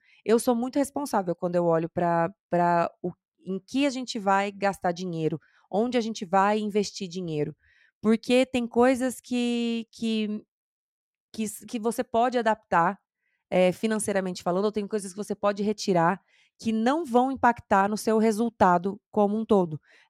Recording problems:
none

